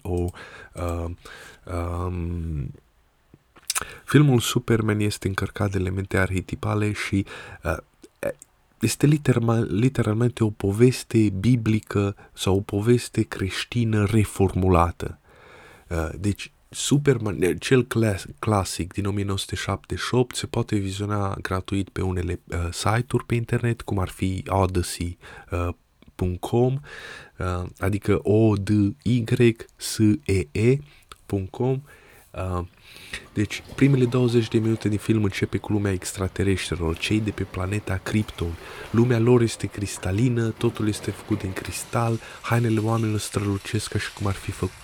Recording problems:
rain or running water; faint; throughout; 20 dB below the speech

